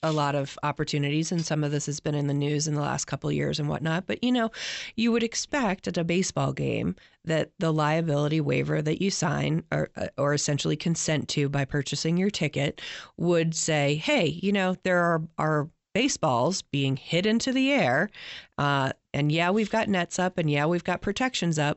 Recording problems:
high frequencies cut off; noticeable; nothing above 8 kHz

